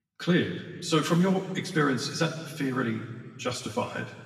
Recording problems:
off-mic speech; far
room echo; slight; dies away in 1.5 s

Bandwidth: 14.5 kHz